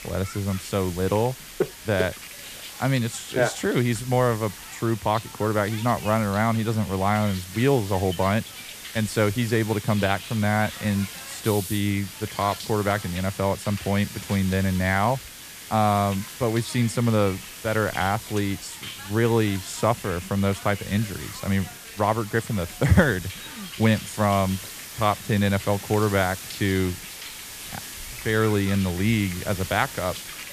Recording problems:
hiss; noticeable; throughout; 10 dB below the speech

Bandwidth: 14.5 kHz